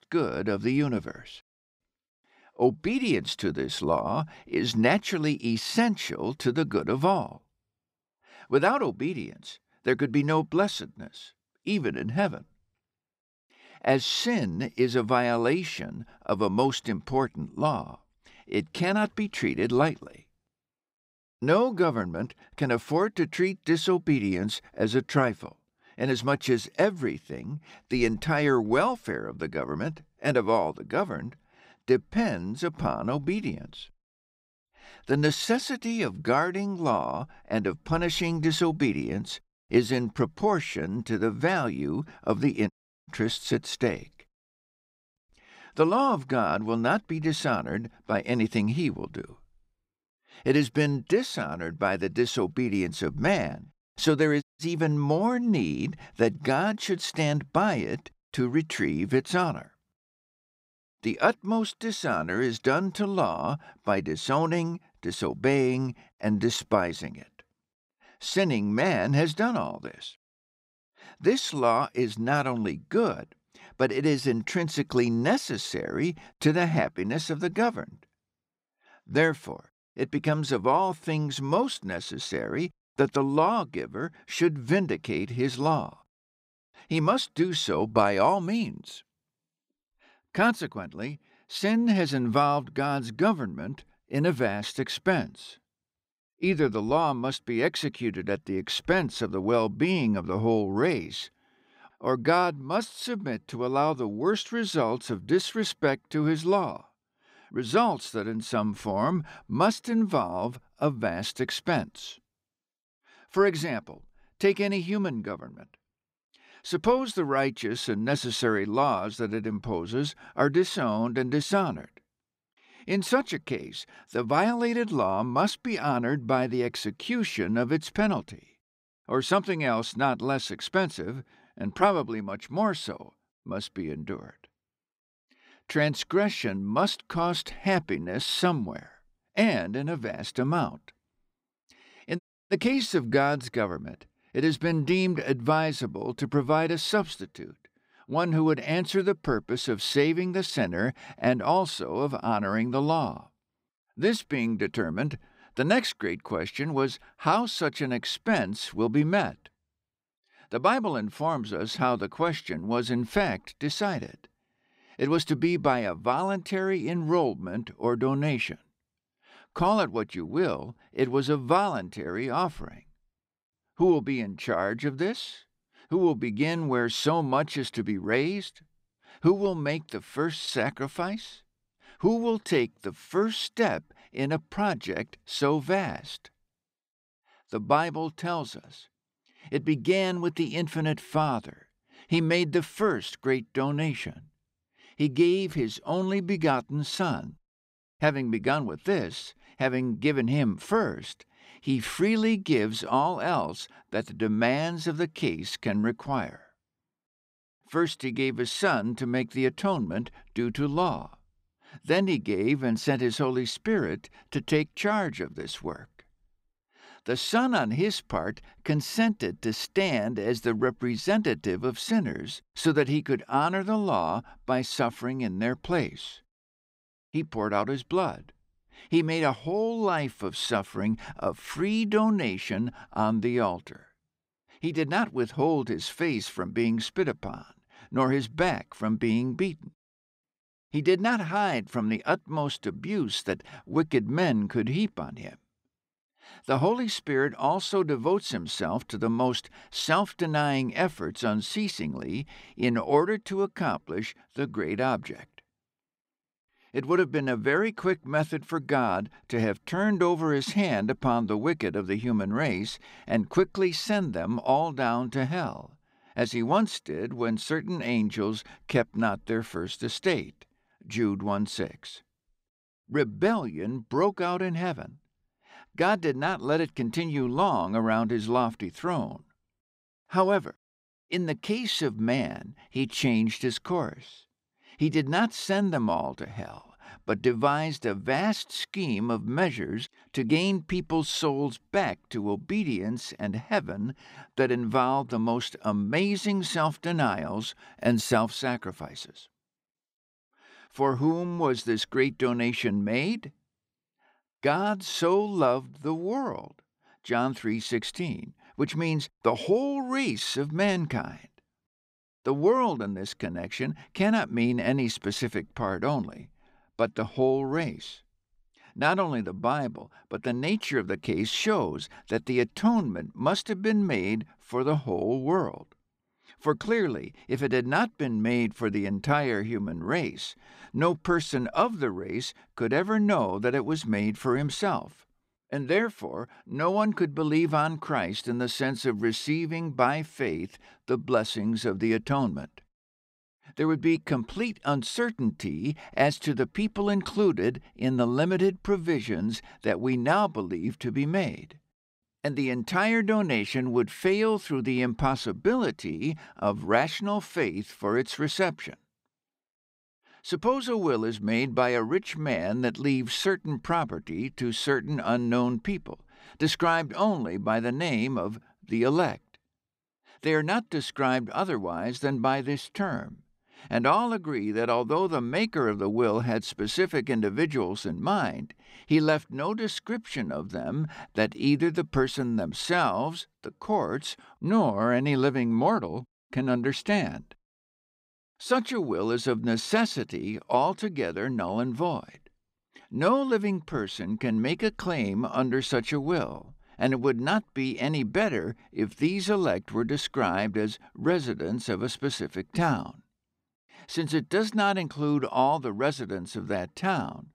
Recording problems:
audio cutting out; at 43 s, at 54 s and at 2:22

